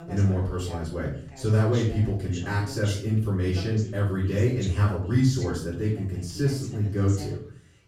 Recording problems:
off-mic speech; far
room echo; noticeable; dies away in 0.4 s
voice in the background; noticeable; throughout; 15 dB below the speech

